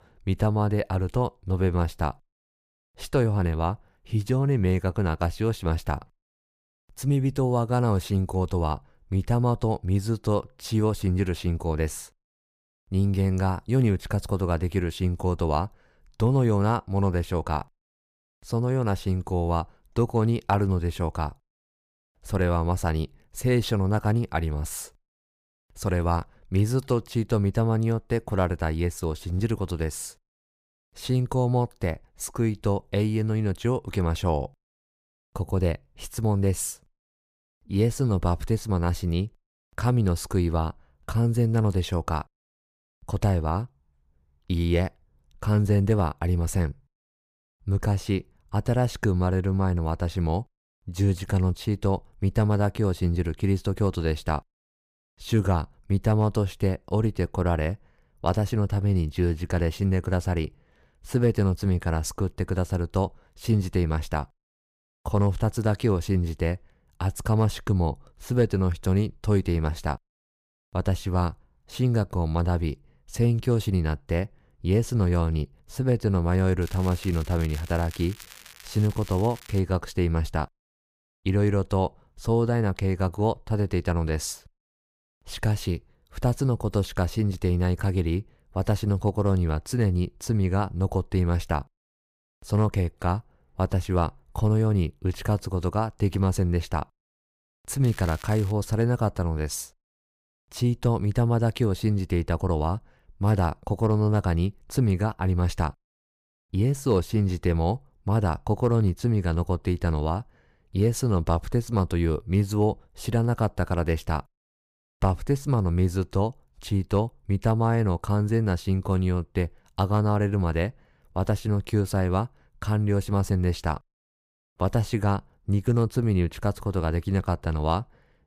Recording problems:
crackling; noticeable; from 1:17 to 1:20 and at 1:38; 20 dB below the speech

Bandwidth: 15 kHz